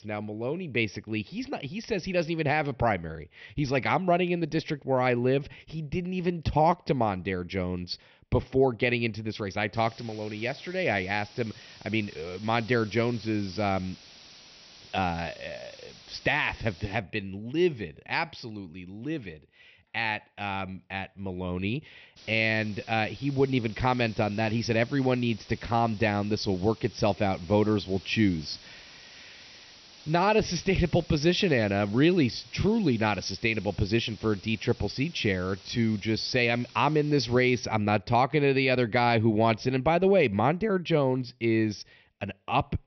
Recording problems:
high frequencies cut off; noticeable; nothing above 6 kHz
hiss; faint; from 9.5 to 17 s and from 22 to 38 s; 20 dB below the speech

